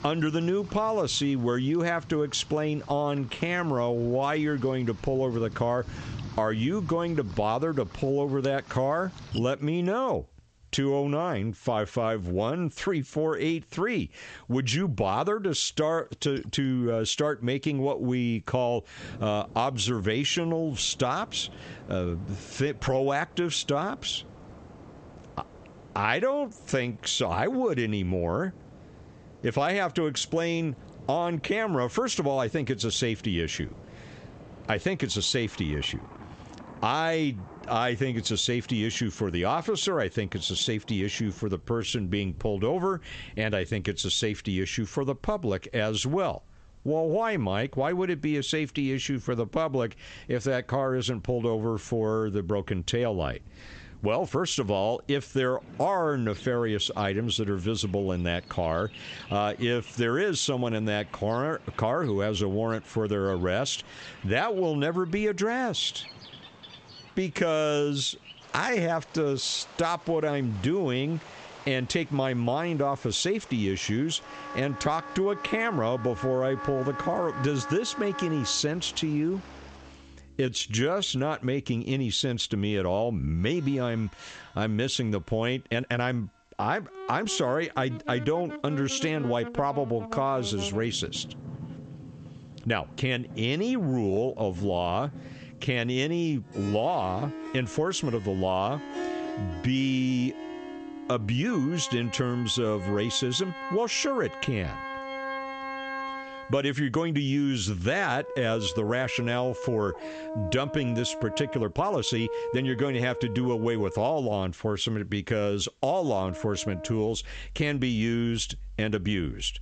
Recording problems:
squashed, flat; heavily, background pumping
high frequencies cut off; noticeable; nothing above 8 kHz
background music; noticeable; from 1:15 on; 10 dB below the speech
rain or running water; faint; until 1:20; 20 dB below the speech
uneven, jittery; strongly; from 24 s to 1:53

